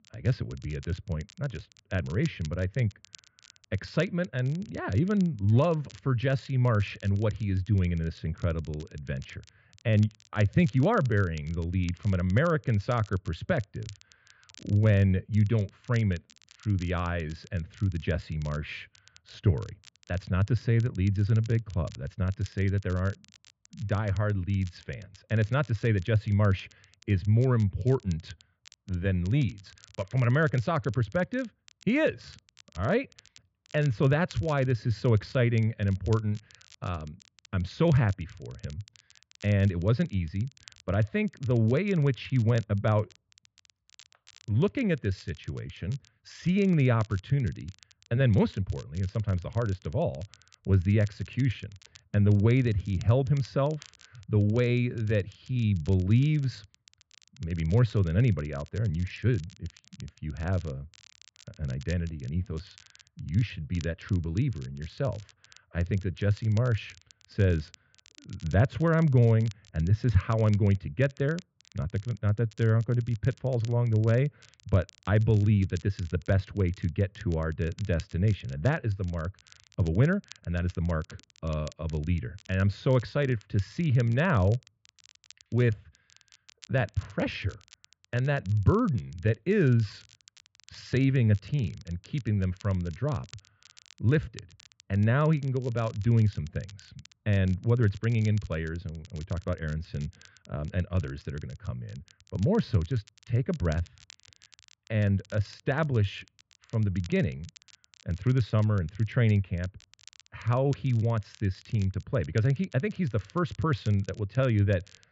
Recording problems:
high frequencies cut off; noticeable; nothing above 8 kHz
muffled; very slightly; fading above 3 kHz
crackle, like an old record; faint; 25 dB below the speech

